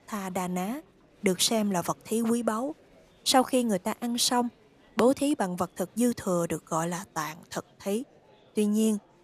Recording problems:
murmuring crowd; faint; throughout; 30 dB below the speech

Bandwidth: 14.5 kHz